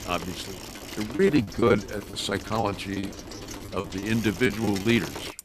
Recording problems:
traffic noise; noticeable; throughout; 10 dB below the speech
choppy; very; 11% of the speech affected

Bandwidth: 14 kHz